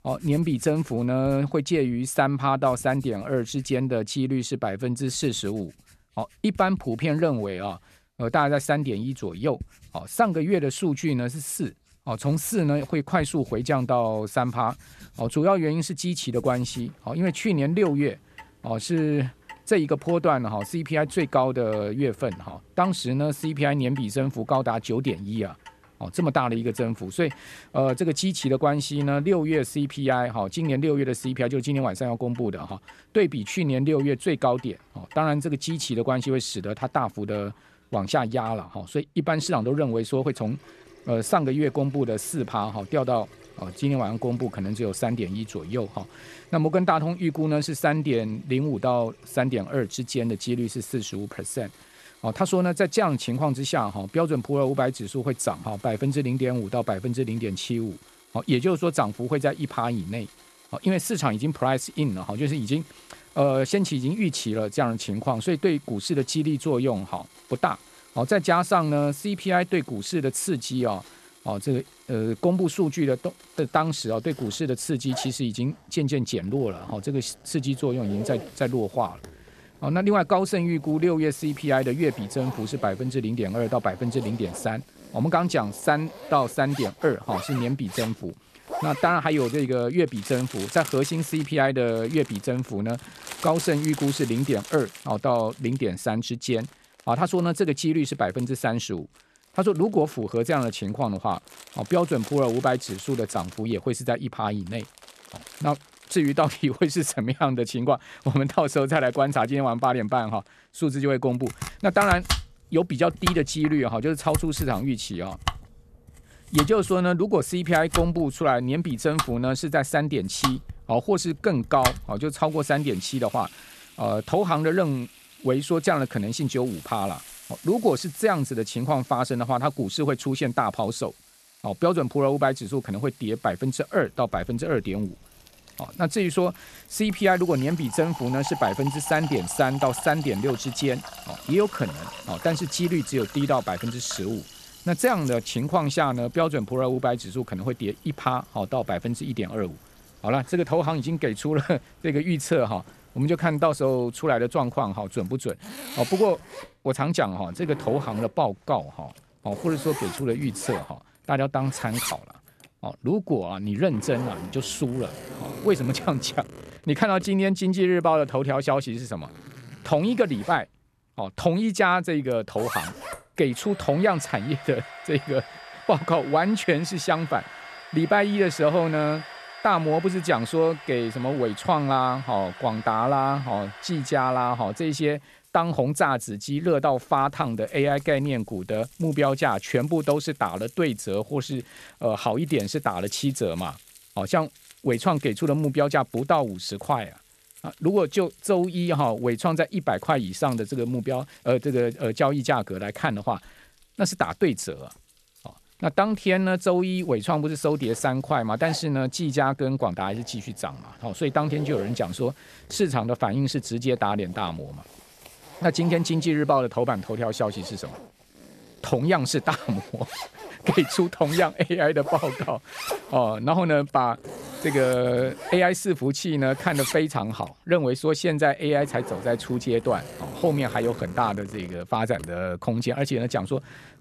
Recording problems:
household noises; noticeable; throughout; 15 dB below the speech

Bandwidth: 13.5 kHz